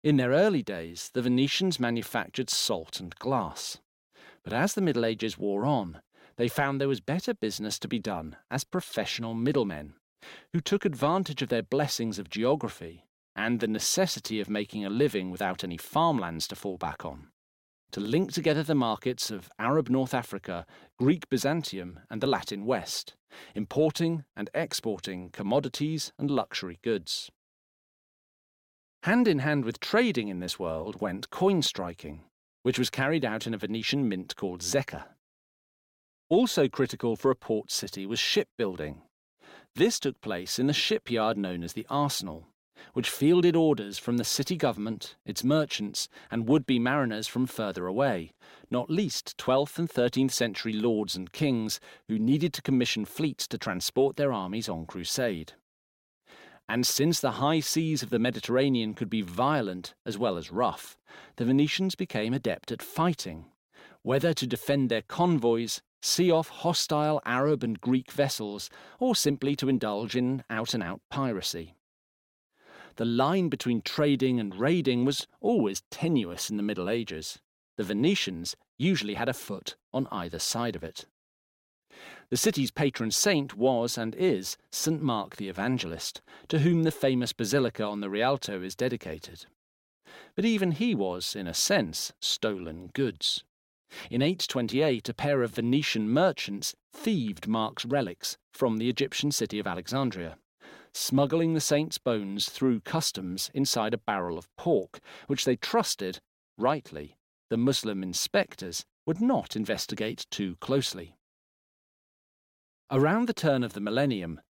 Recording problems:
none

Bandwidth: 16.5 kHz